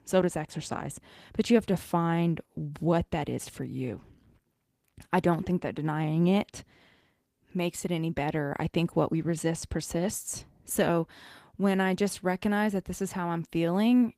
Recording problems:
garbled, watery; slightly

